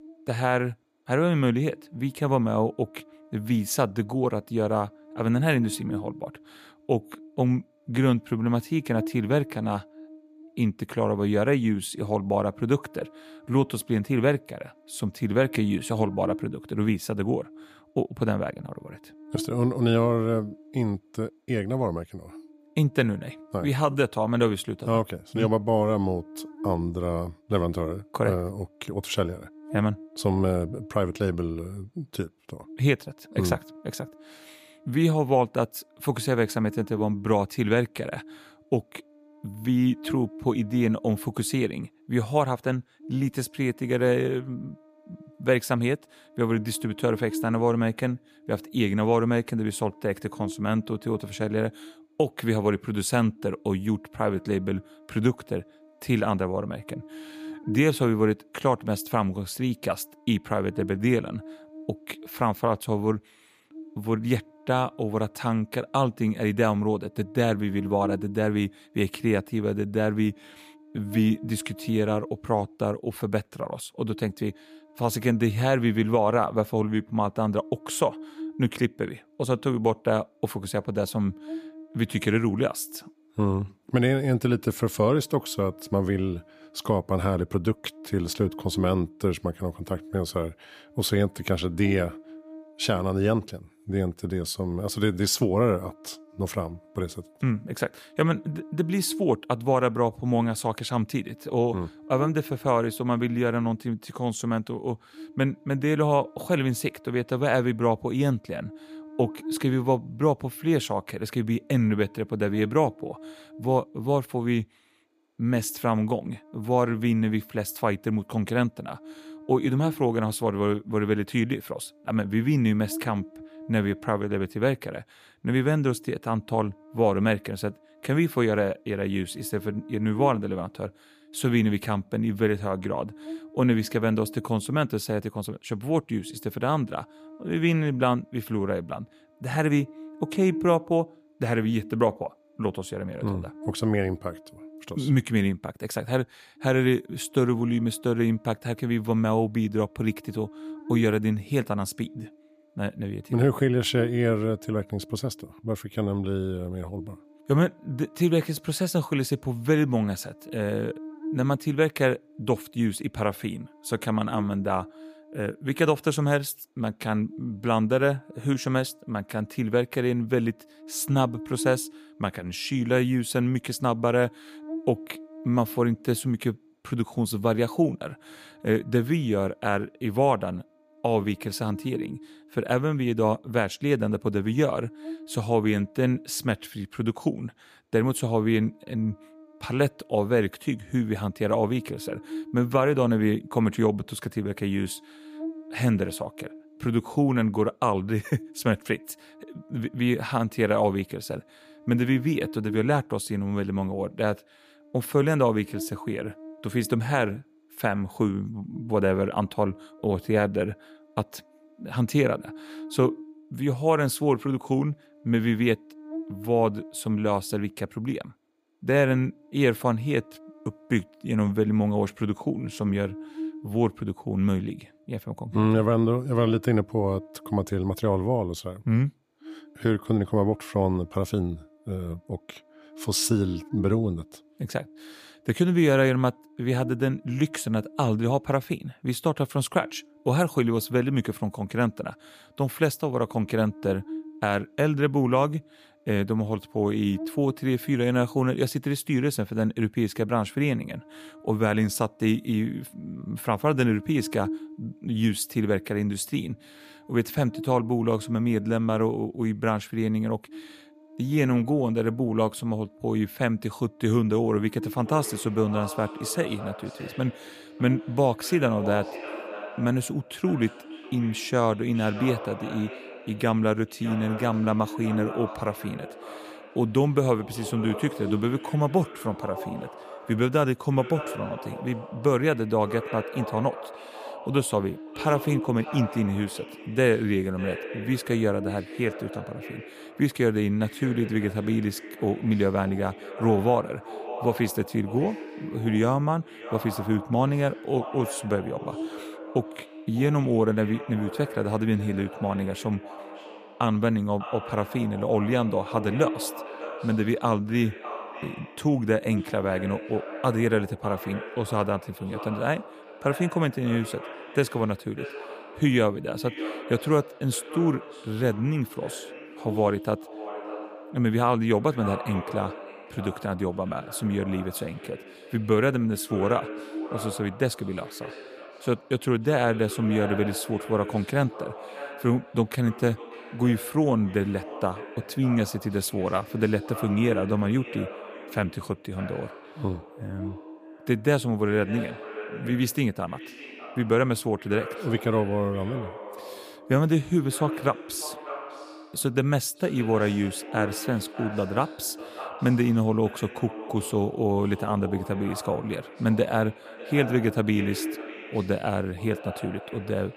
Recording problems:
echo of what is said; noticeable; from 4:25 on; 600 ms later, 15 dB below the speech
electrical hum; noticeable; throughout; 50 Hz, 20 dB below the speech

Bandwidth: 15 kHz